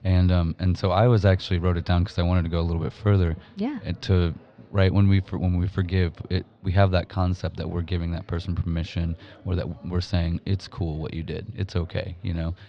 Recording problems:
muffled; very slightly; fading above 4.5 kHz
chatter from many people; faint; throughout; 30 dB below the speech

